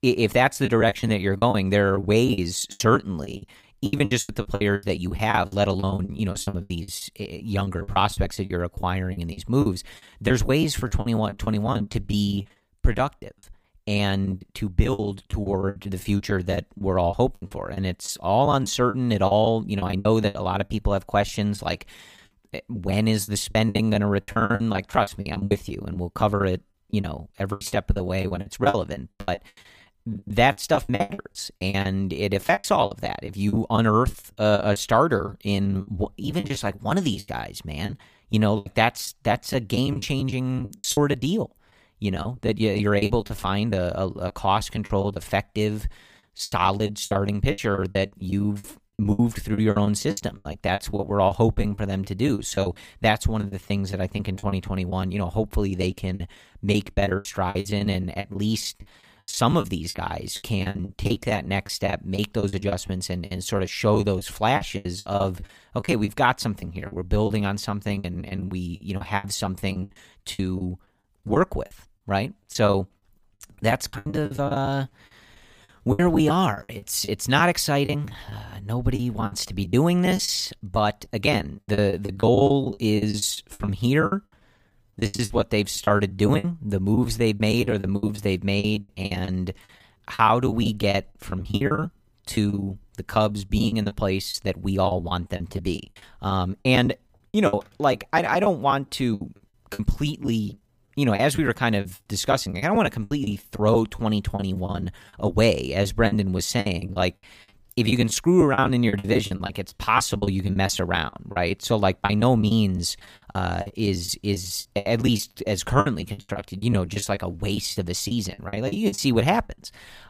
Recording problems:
choppy; very; 18% of the speech affected

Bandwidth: 15 kHz